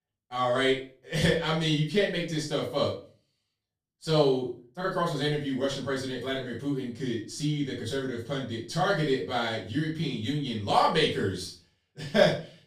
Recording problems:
off-mic speech; far
room echo; slight; dies away in 0.3 s

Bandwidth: 15 kHz